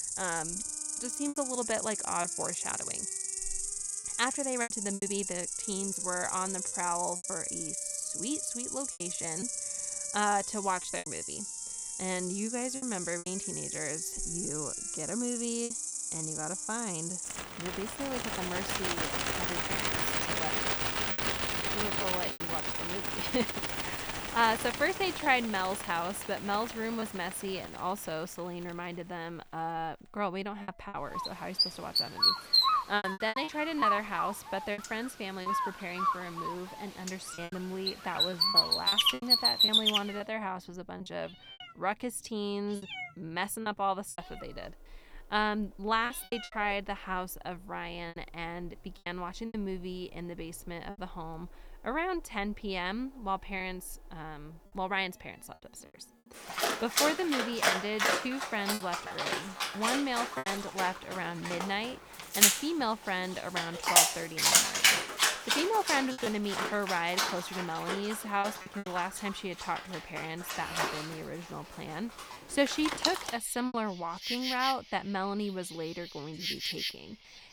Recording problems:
animal sounds; very loud; throughout; 4 dB above the speech
background music; faint; throughout; 25 dB below the speech
choppy; occasionally; 5% of the speech affected

